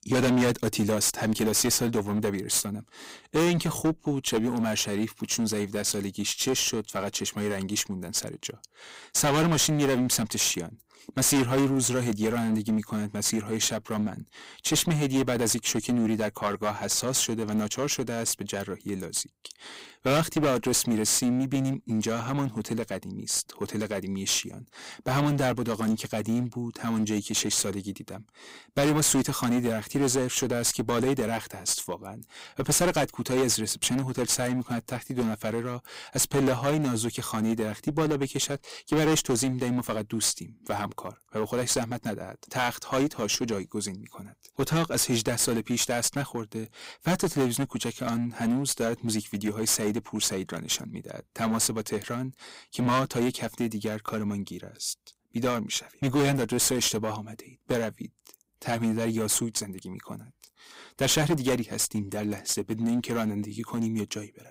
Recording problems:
distortion; heavy; 9% of the sound clipped

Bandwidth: 15.5 kHz